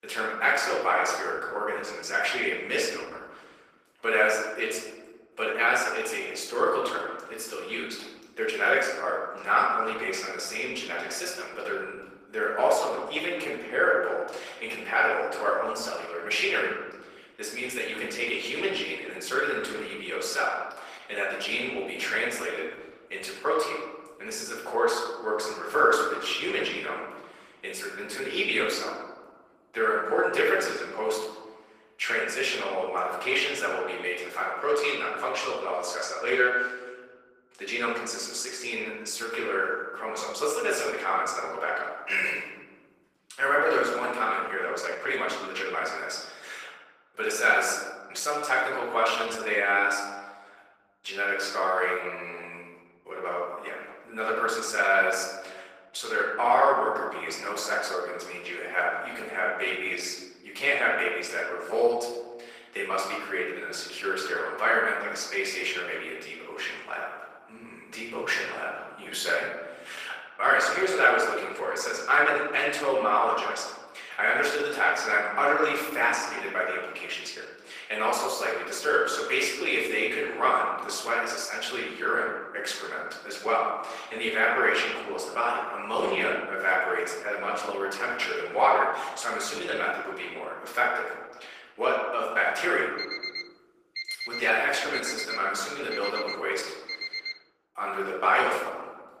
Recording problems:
off-mic speech; far
thin; very; fading below 400 Hz
room echo; noticeable; dies away in 1.3 s
garbled, watery; slightly; nothing above 15 kHz
alarm; noticeable; from 1:33 to 1:37; peak 5 dB below the speech

